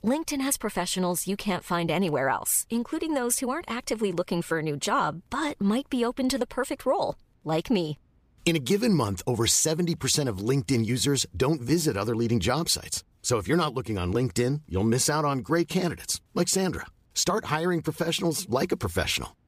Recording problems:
none

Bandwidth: 15 kHz